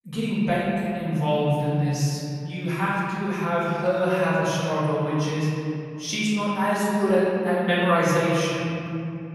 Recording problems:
room echo; strong; dies away in 2.7 s
off-mic speech; far

